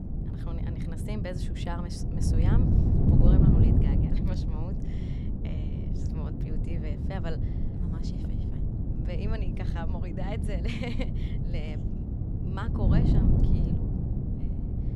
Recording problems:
wind noise on the microphone; heavy; 3 dB above the speech

